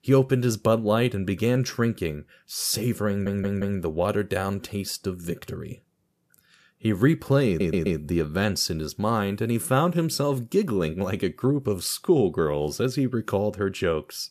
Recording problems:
audio stuttering; at 3 s and at 7.5 s

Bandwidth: 14.5 kHz